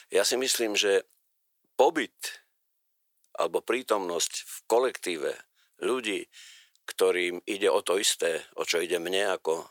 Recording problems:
thin; very; fading below 400 Hz

